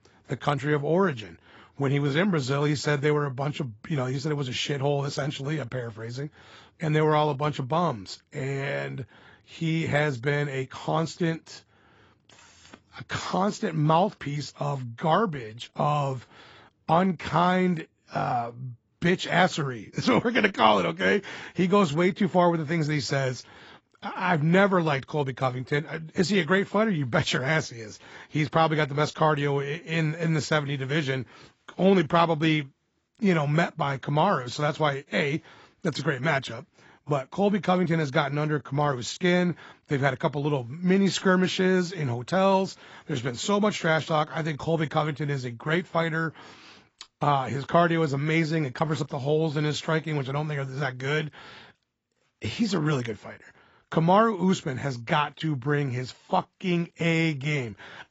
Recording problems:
garbled, watery; badly; nothing above 7.5 kHz

